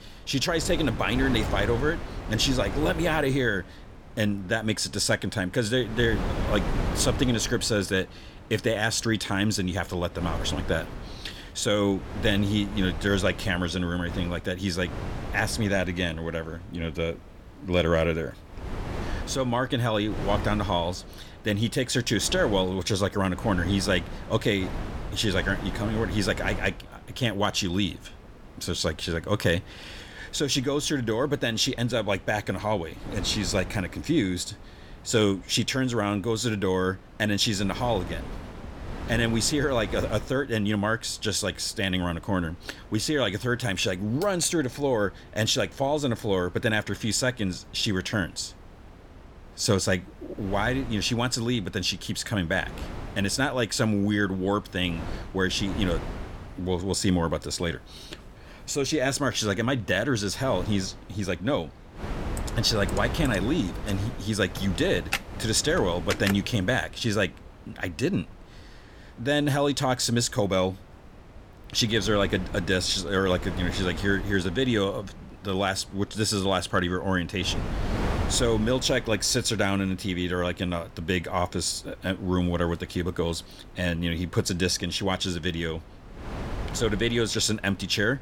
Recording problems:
wind noise on the microphone; occasional gusts; 15 dB below the speech
keyboard typing; noticeable; from 1:02 to 1:06; peak 4 dB below the speech

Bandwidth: 17 kHz